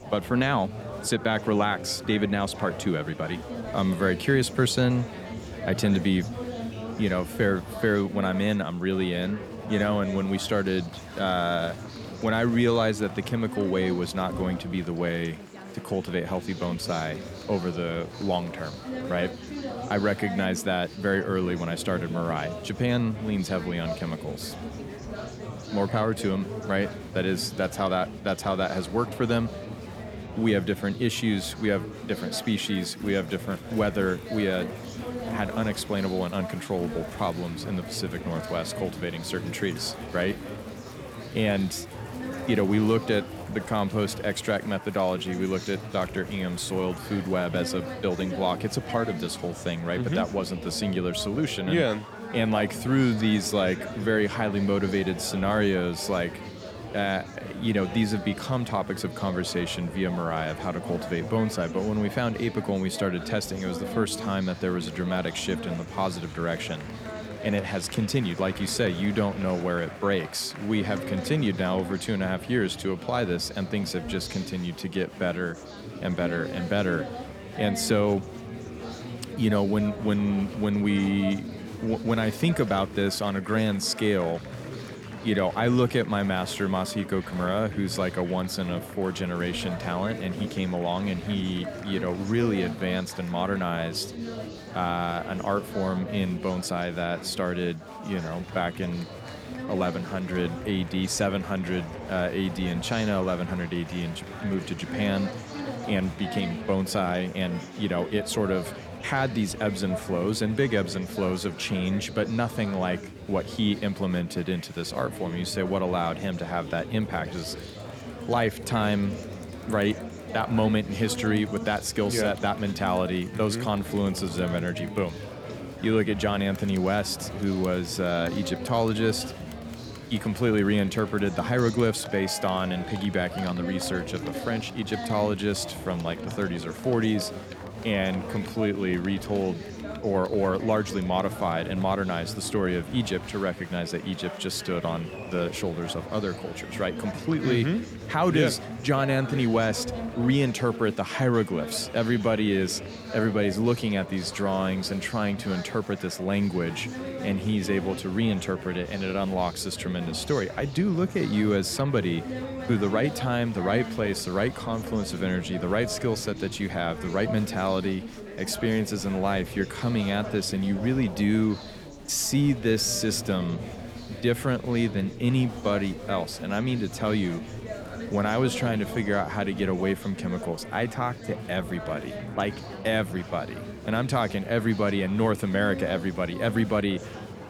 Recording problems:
chatter from many people; loud; throughout; 10 dB below the speech

